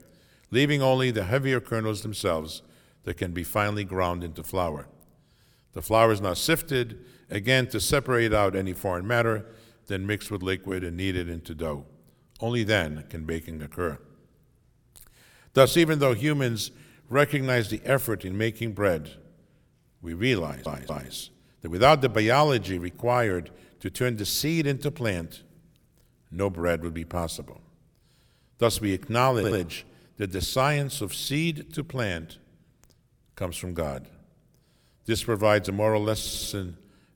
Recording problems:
audio stuttering; at 20 s, at 29 s and at 36 s

